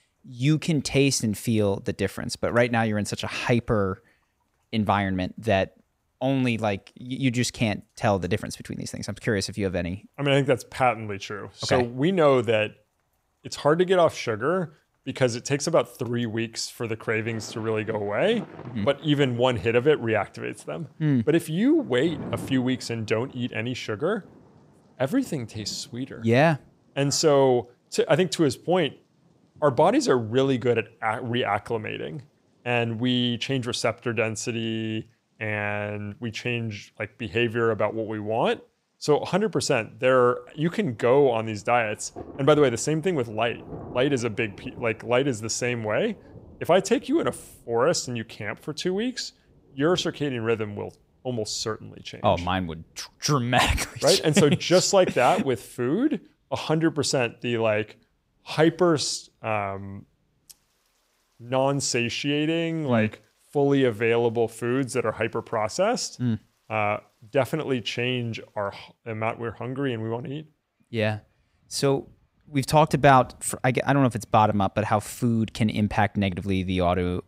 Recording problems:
rain or running water; faint; throughout; 25 dB below the speech

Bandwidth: 15.5 kHz